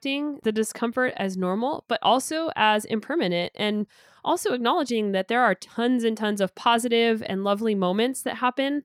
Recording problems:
none

